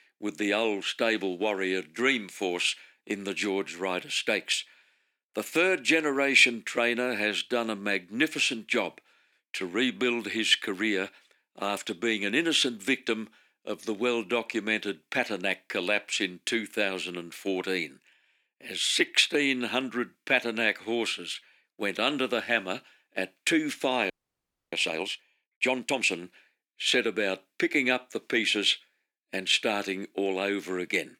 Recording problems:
thin; somewhat; fading below 250 Hz
audio freezing; at 24 s for 0.5 s

